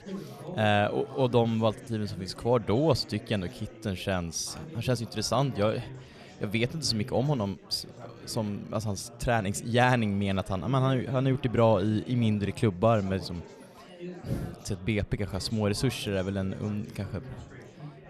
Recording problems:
chatter from many people; noticeable; throughout; 15 dB below the speech

